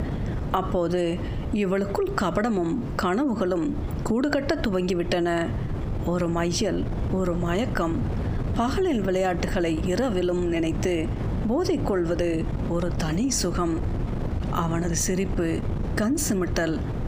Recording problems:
squashed, flat; heavily
wind noise on the microphone; occasional gusts; 10 dB below the speech

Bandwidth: 15 kHz